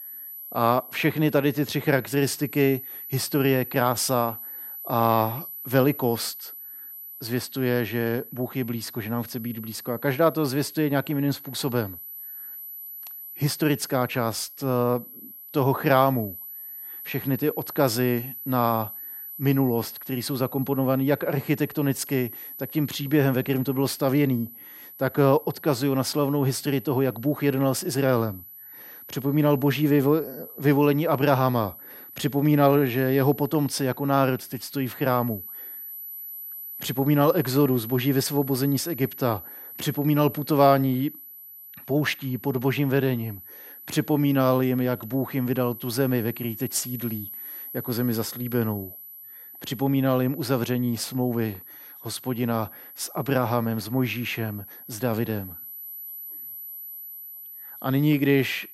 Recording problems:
high-pitched whine; noticeable; throughout; 12 kHz, 15 dB below the speech

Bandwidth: 16 kHz